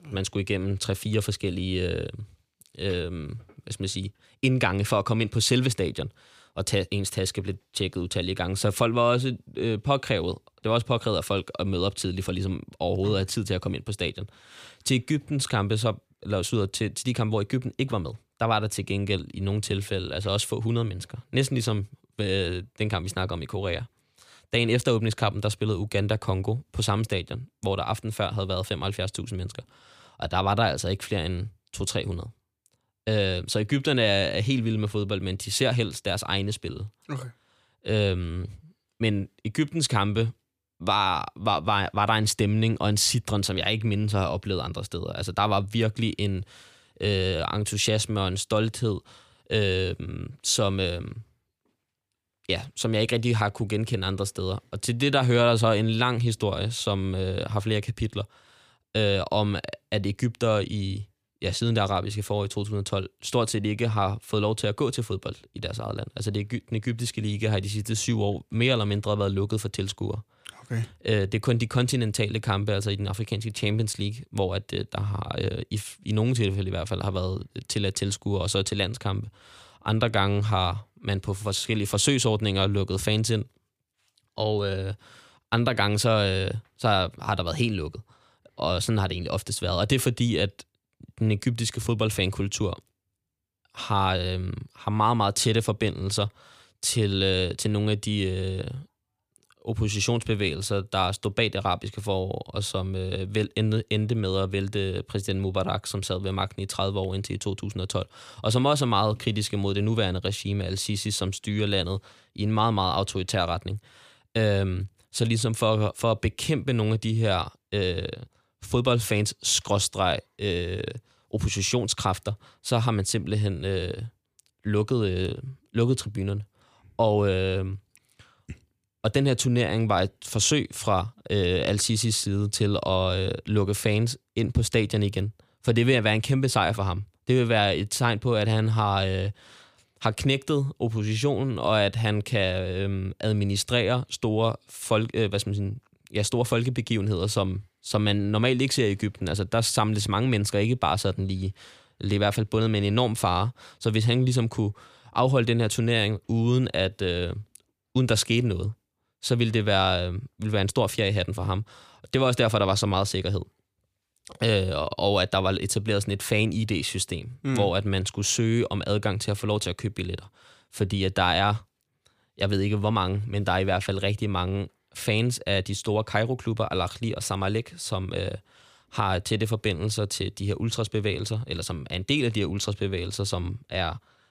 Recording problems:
none

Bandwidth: 15 kHz